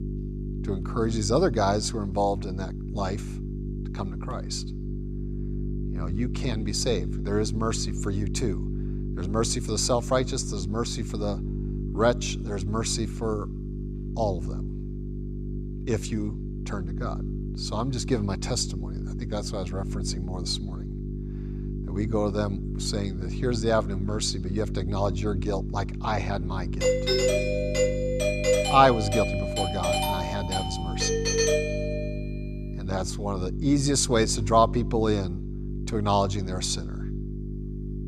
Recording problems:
electrical hum; noticeable; throughout; 50 Hz, 15 dB below the speech
doorbell; loud; from 27 to 32 s; peak 5 dB above the speech

